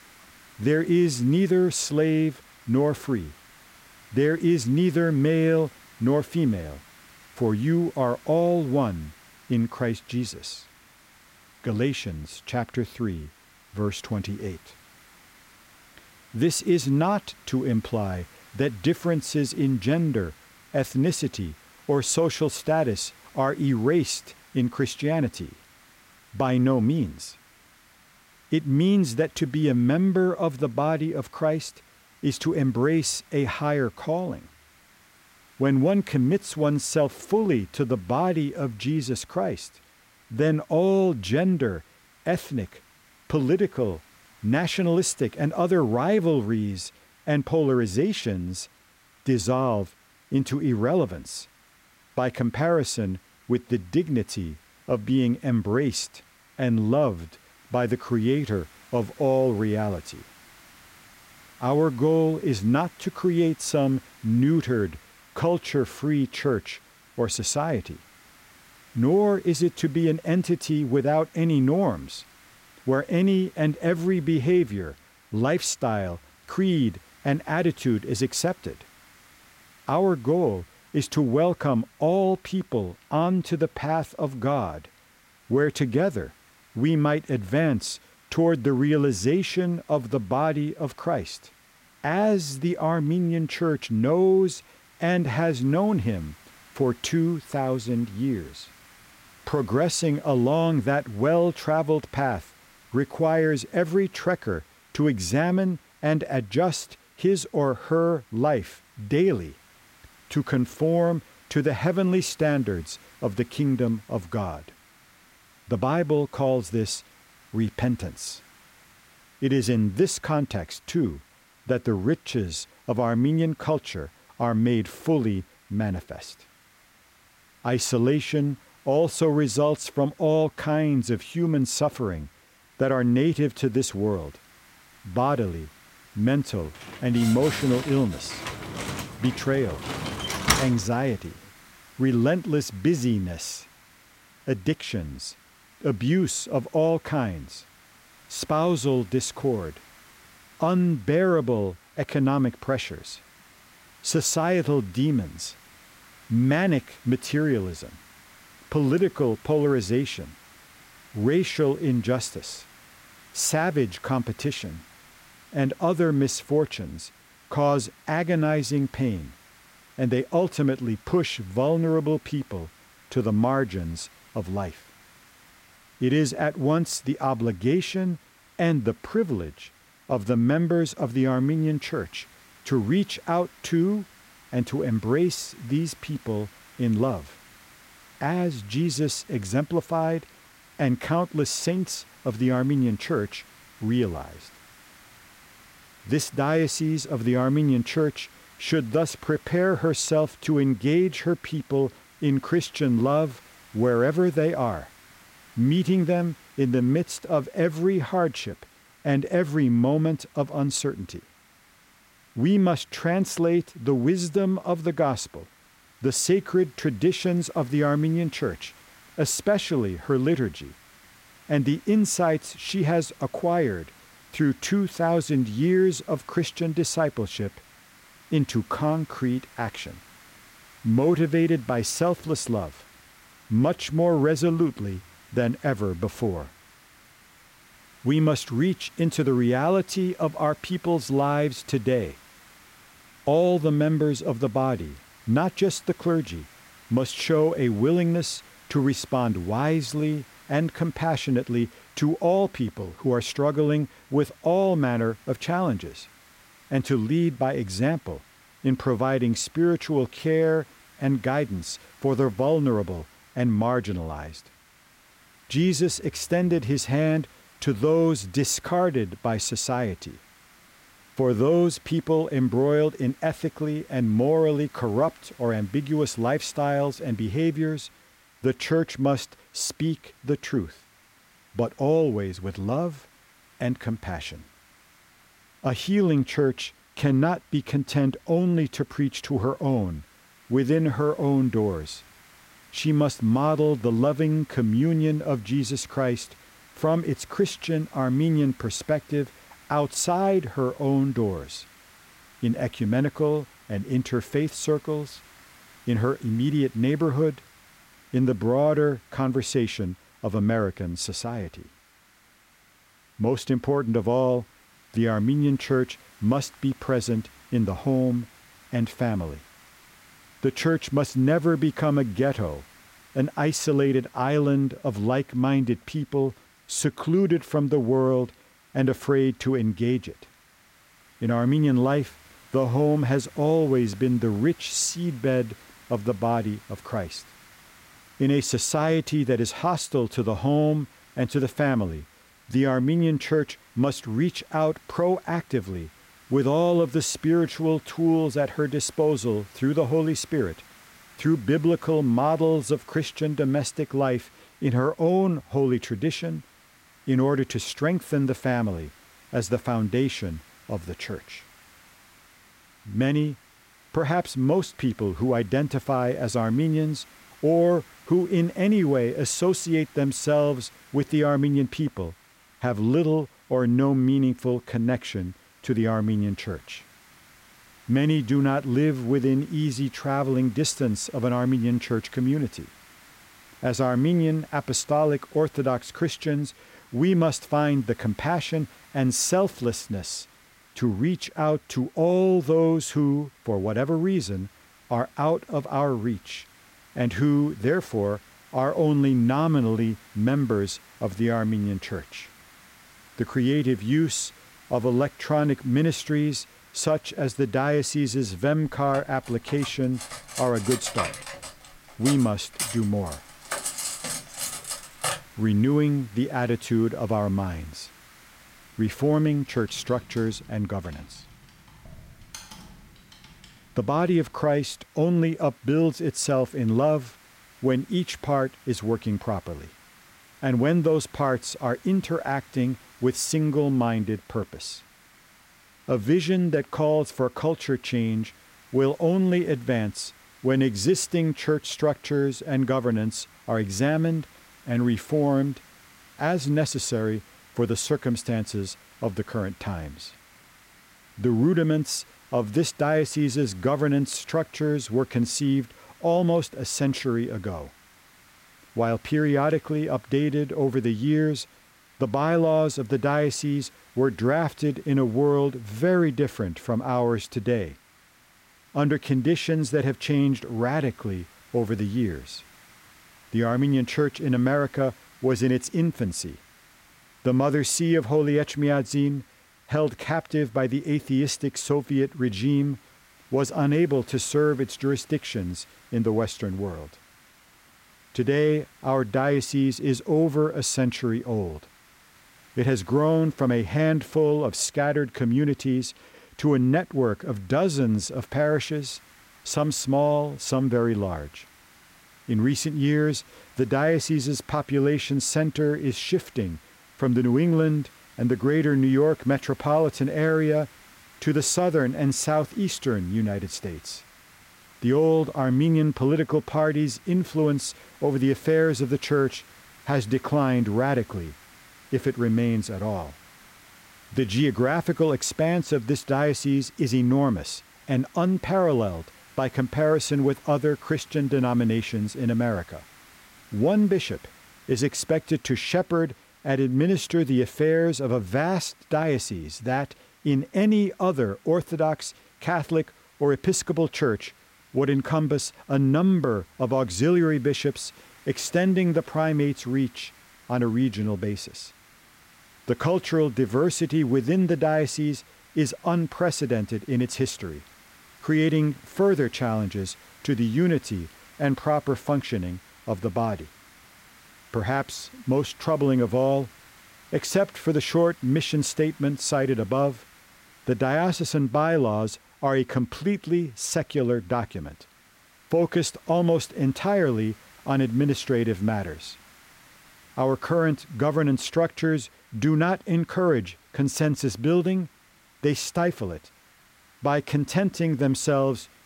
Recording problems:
hiss; faint; throughout; 25 dB below the speech
door banging; loud; from 2:17 to 2:21; peak 3 dB above the speech
clattering dishes; noticeable; from 6:49 to 6:55; peak 3 dB below the speech
keyboard typing; faint; from 6:59 to 7:04; peak 15 dB below the speech

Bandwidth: 16 kHz